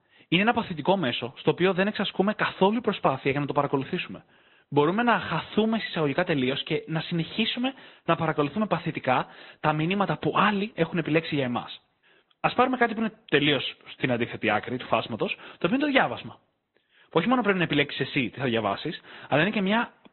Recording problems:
high frequencies cut off; severe; nothing above 4 kHz
garbled, watery; slightly

